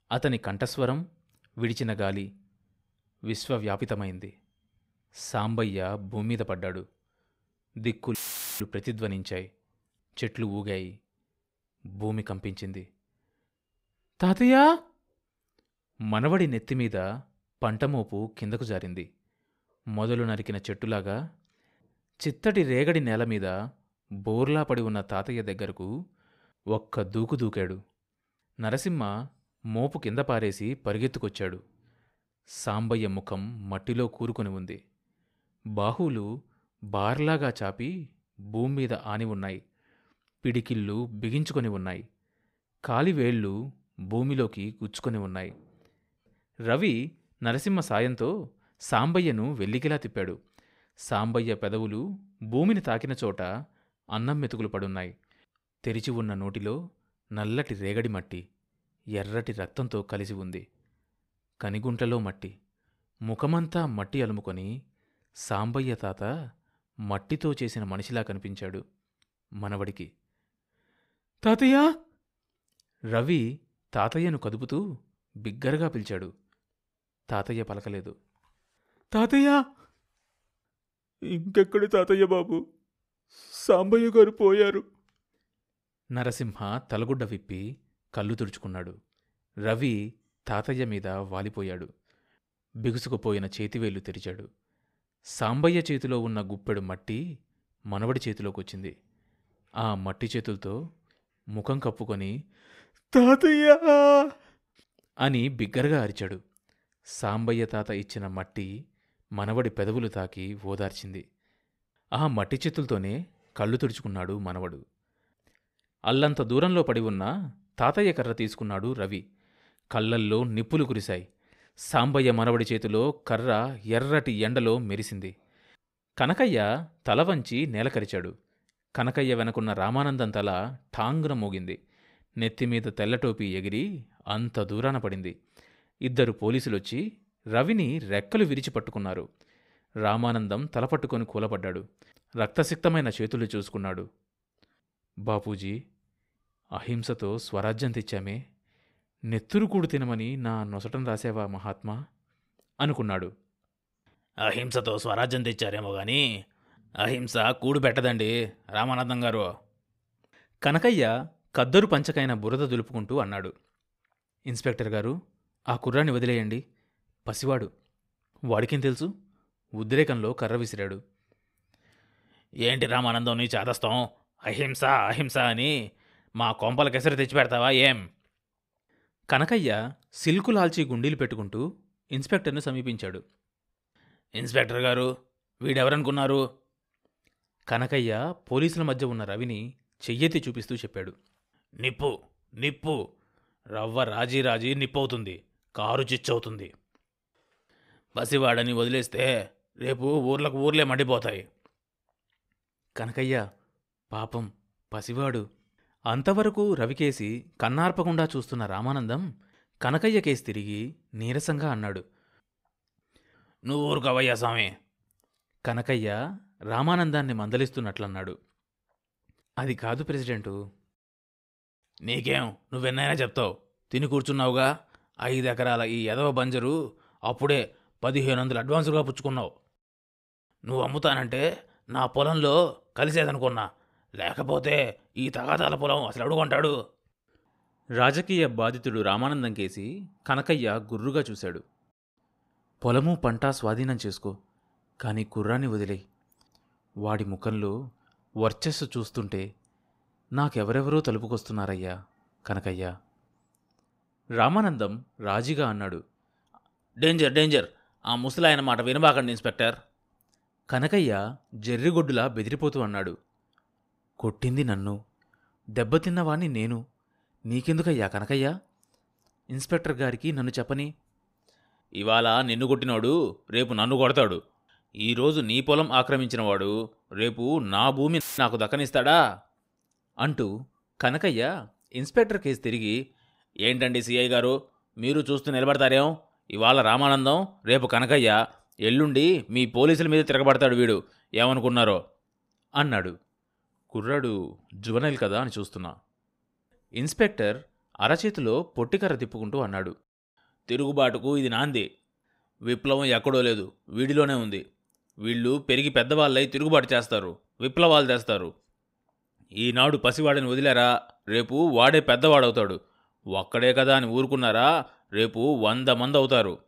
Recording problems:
audio cutting out; filled with static; at 8 s and at 4:38

